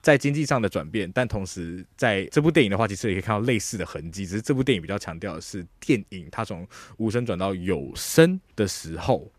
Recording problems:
none

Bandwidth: 14.5 kHz